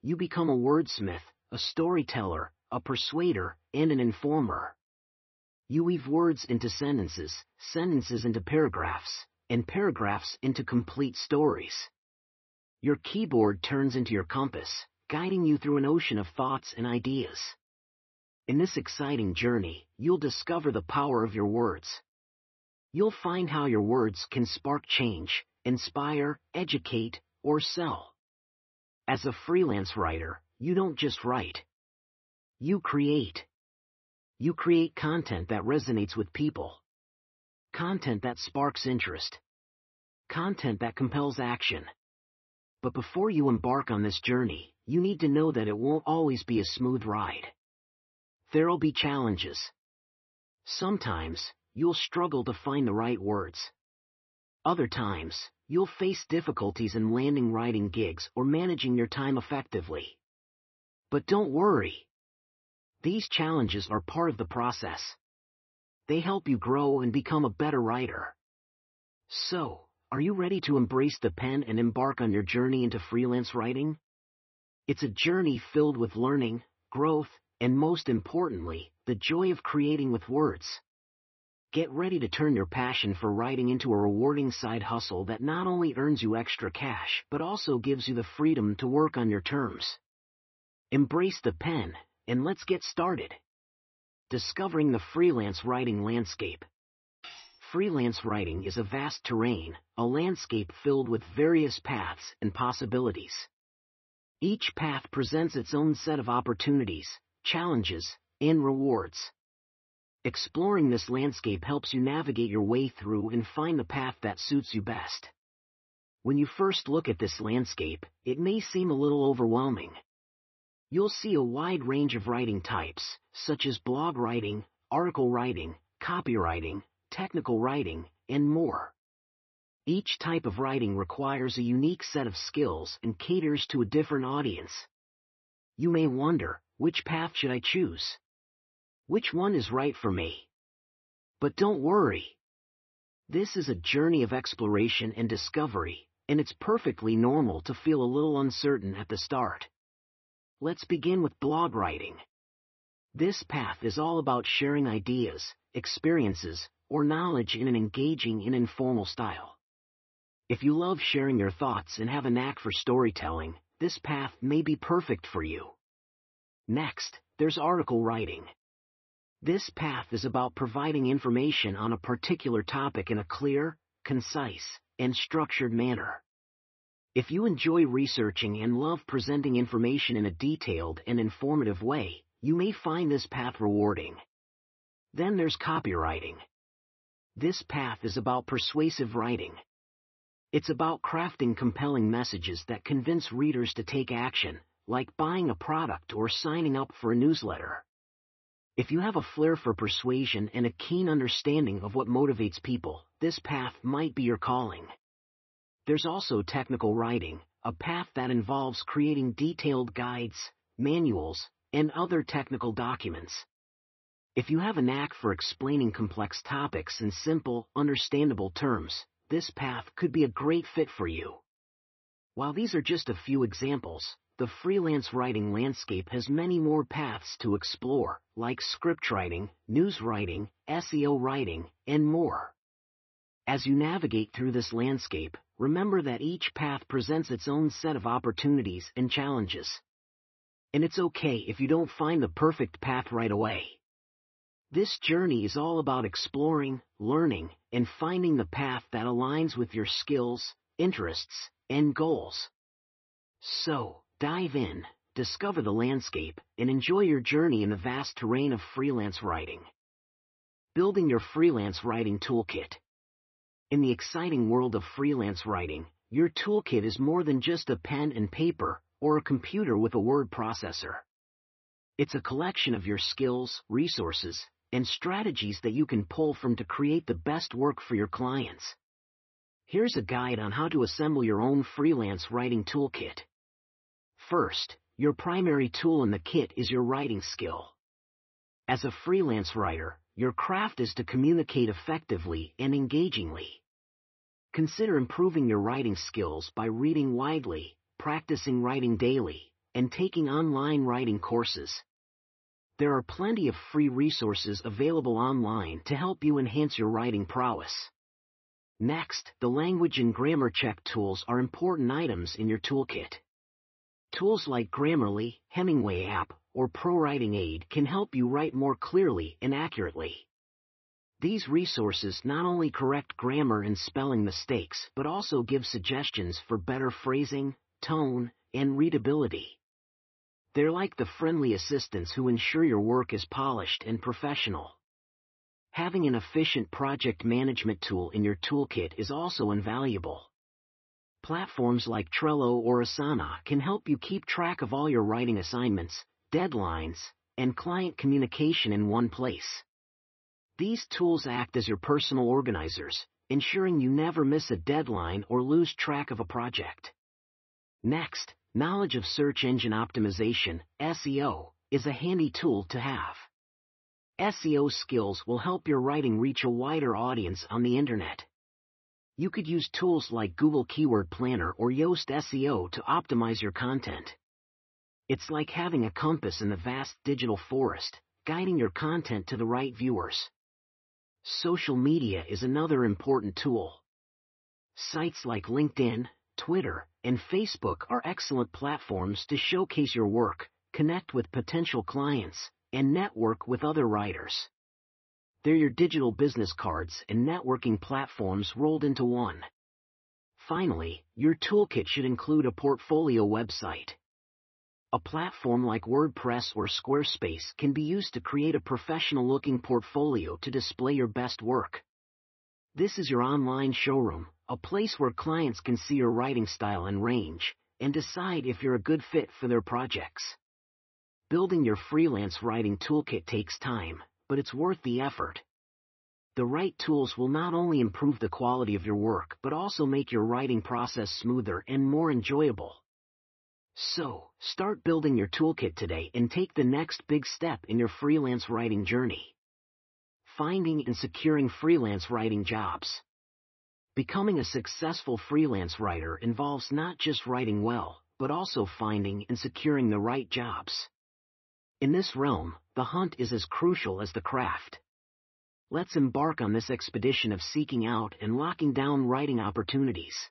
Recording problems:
garbled, watery; slightly; nothing above 6 kHz
muffled; very slightly; fading above 2.5 kHz
clattering dishes; faint; at 1:37; peak 15 dB below the speech

